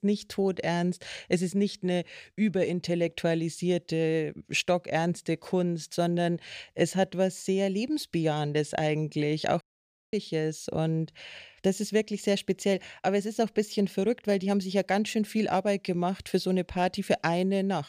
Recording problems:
audio cutting out; at 9.5 s for 0.5 s

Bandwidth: 14.5 kHz